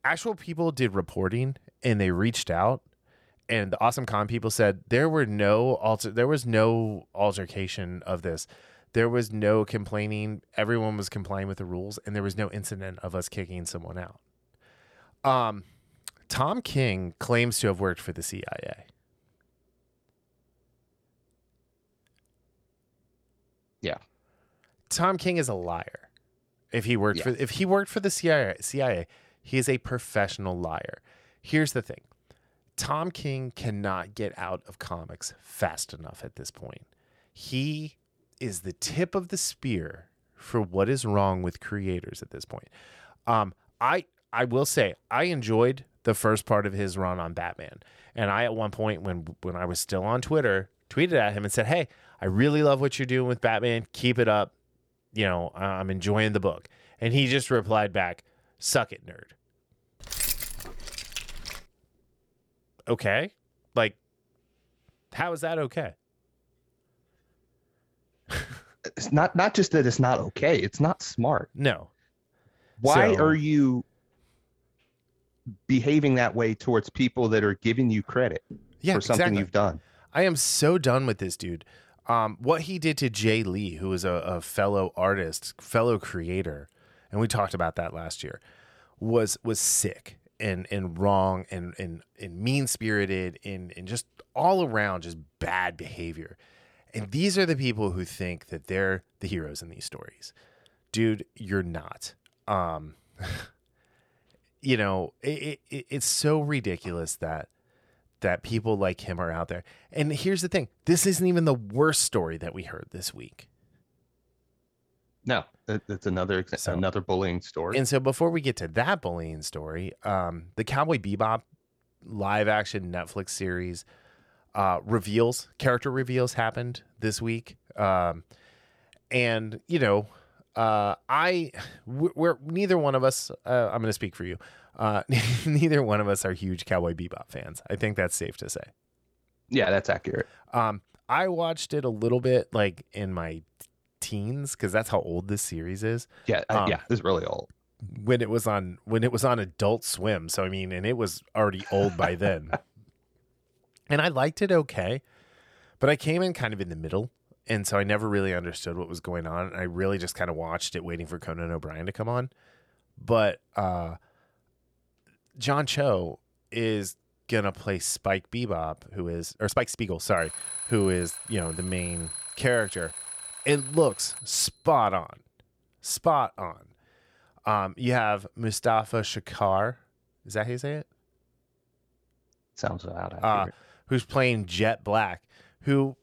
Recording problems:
uneven, jittery; strongly; from 3 s to 3:05
jangling keys; loud; from 1:00 to 1:02; peak level with the speech
alarm; noticeable; from 2:50 to 2:54; peak 5 dB below the speech

